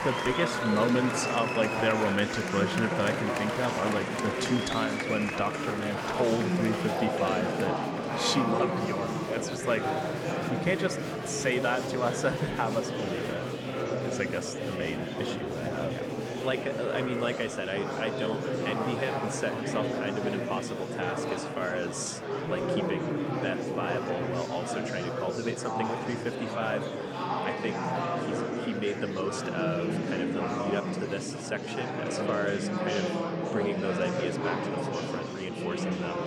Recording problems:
murmuring crowd; very loud; throughout; 1 dB above the speech

